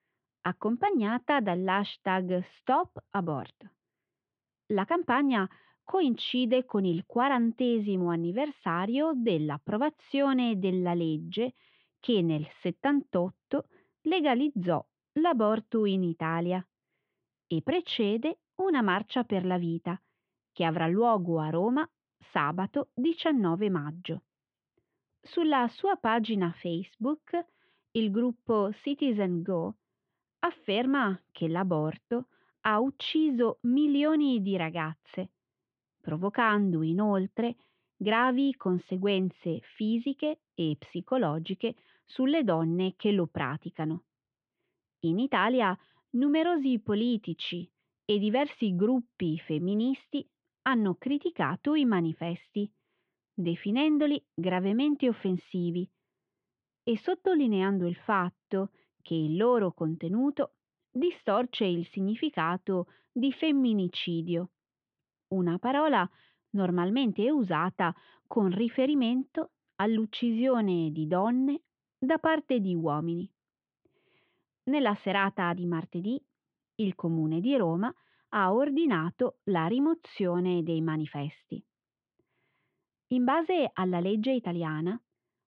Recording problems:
muffled; very; fading above 3 kHz

